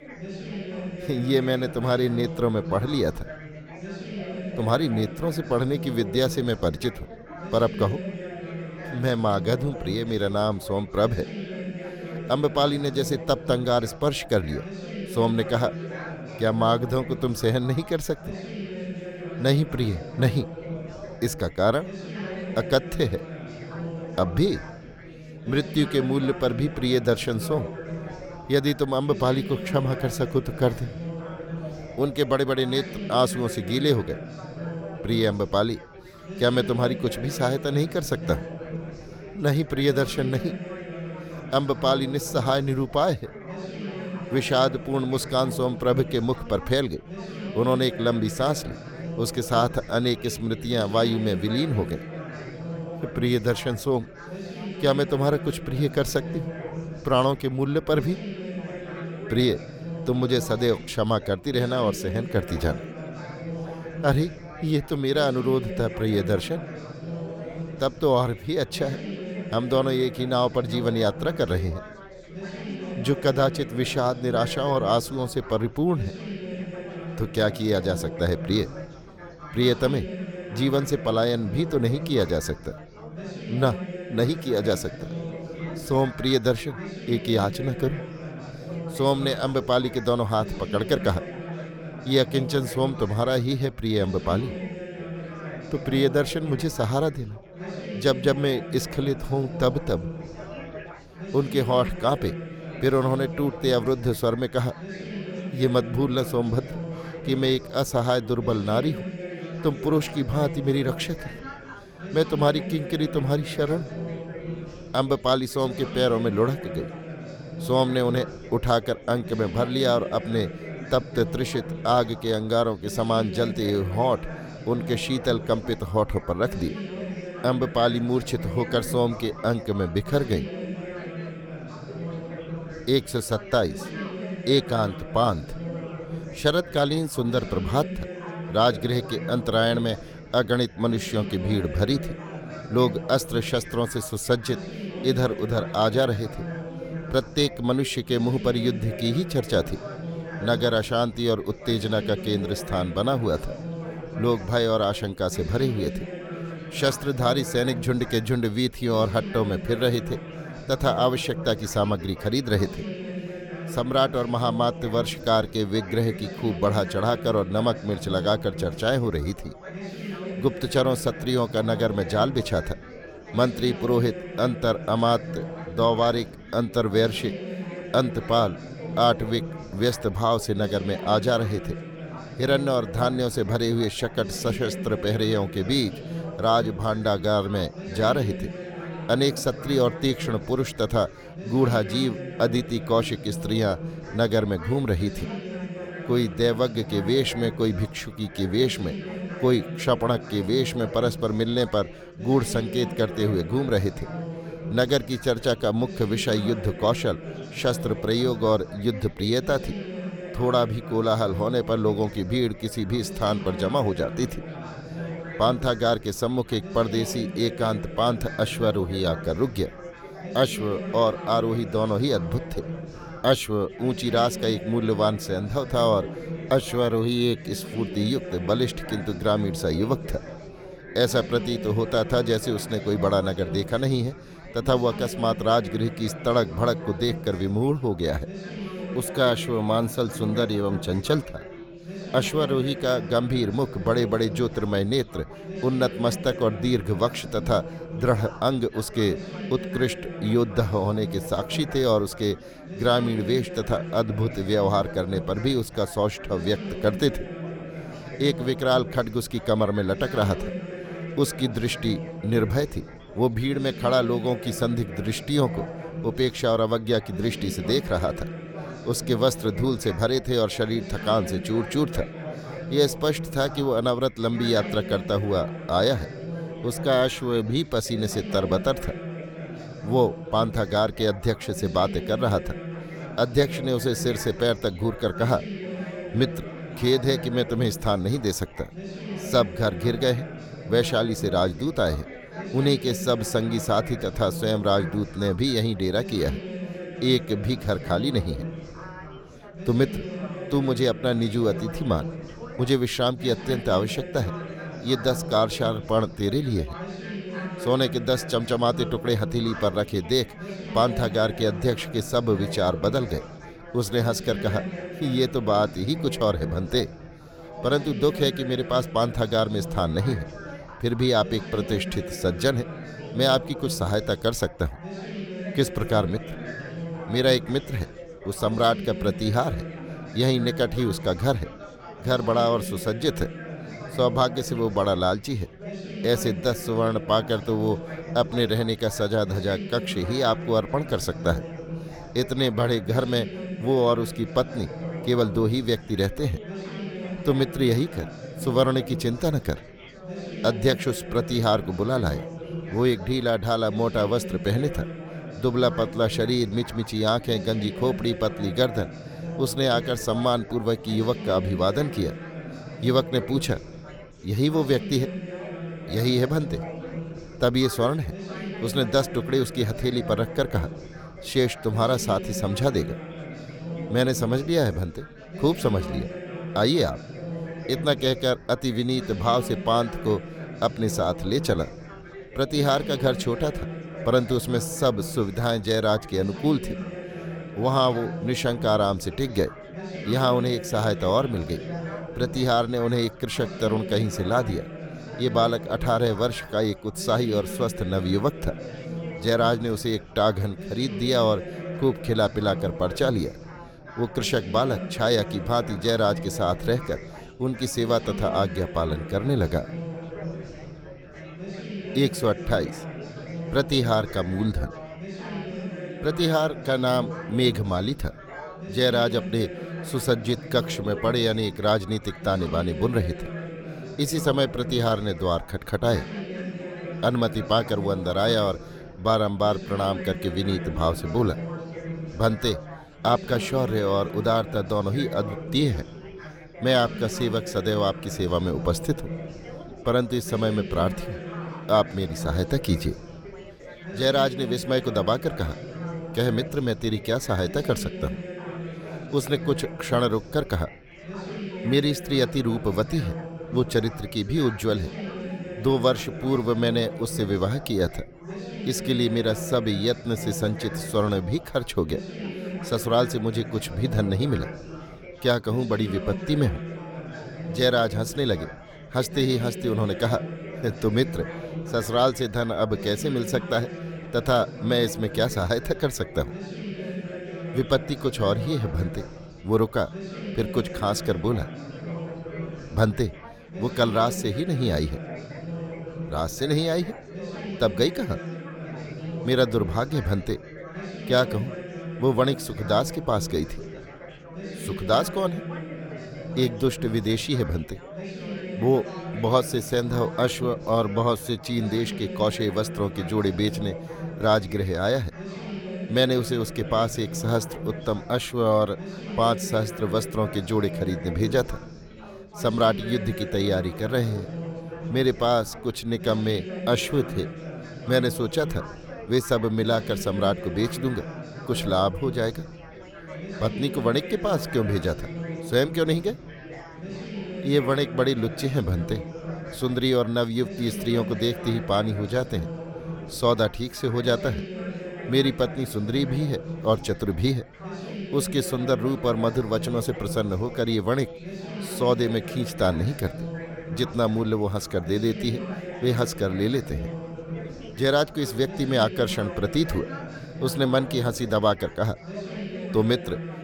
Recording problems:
chatter from many people; noticeable; throughout; 10 dB below the speech

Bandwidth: 18.5 kHz